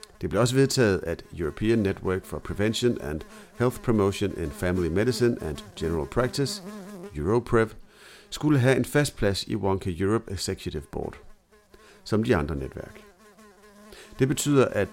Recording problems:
electrical hum; faint; throughout; 60 Hz, 20 dB below the speech

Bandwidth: 16 kHz